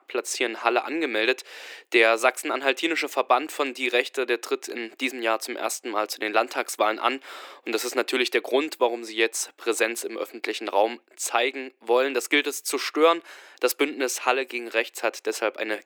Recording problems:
thin; very; fading below 300 Hz

